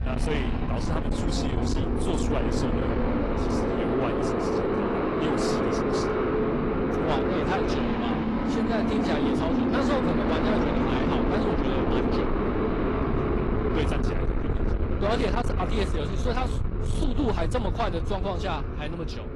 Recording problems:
distortion; slight; 10 dB below the speech
garbled, watery; slightly; nothing above 11 kHz
traffic noise; very loud; throughout; 4 dB above the speech
wind noise on the microphone; occasional gusts; 10 dB below the speech

